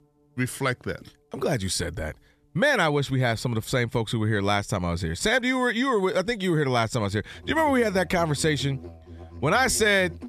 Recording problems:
background music; noticeable; throughout; 20 dB below the speech

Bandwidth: 14 kHz